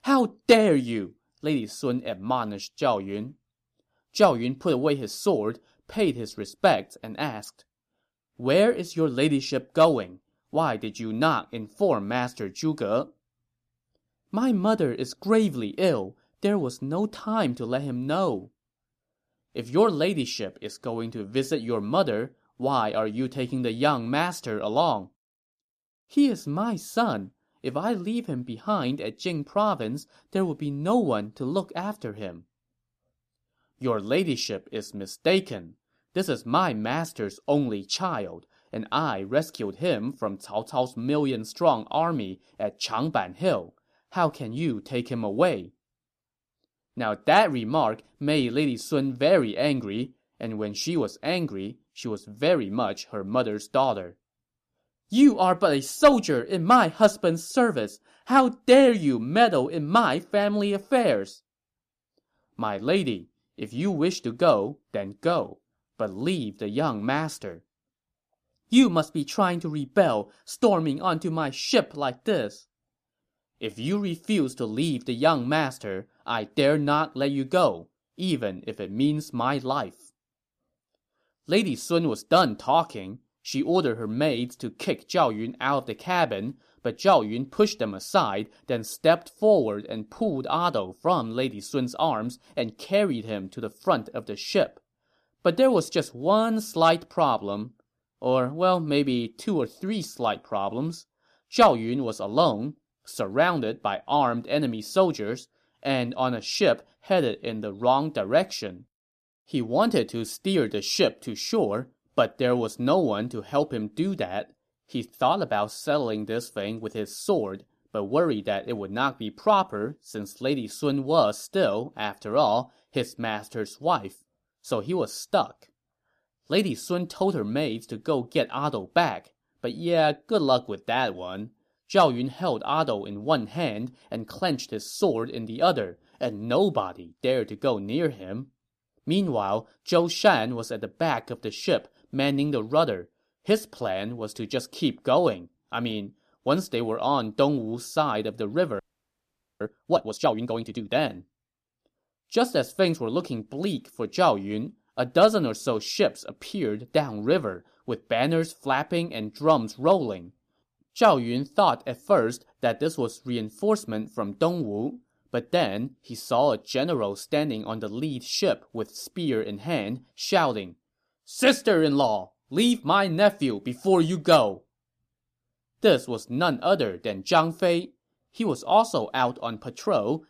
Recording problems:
audio freezing; at 2:29 for 1 s

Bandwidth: 14.5 kHz